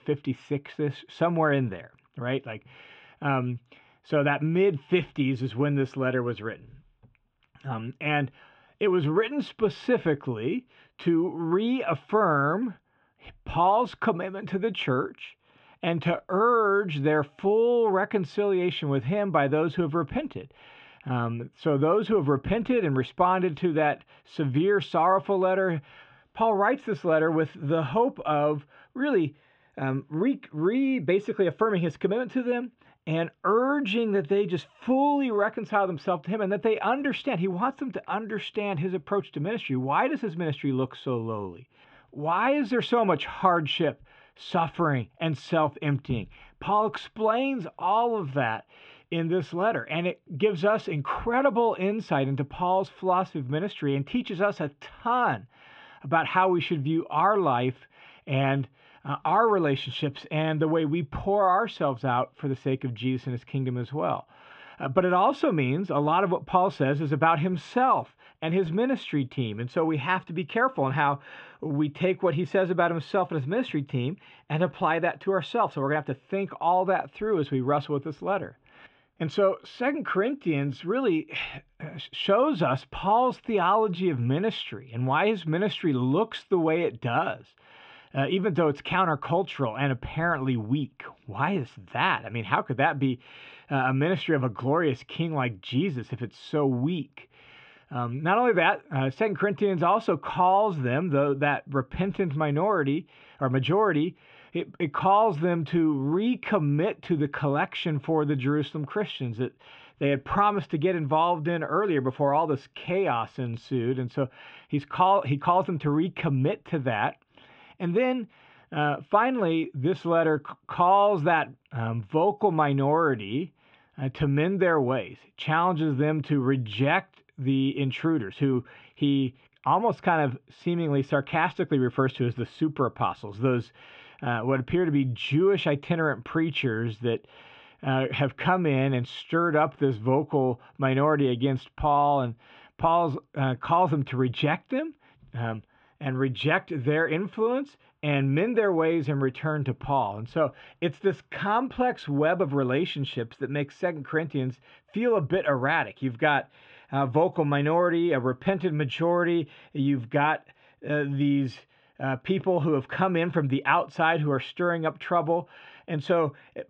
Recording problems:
muffled; very; fading above 3 kHz

